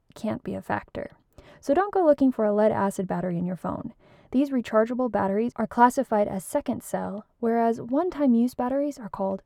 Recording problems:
muffled; slightly; fading above 2 kHz

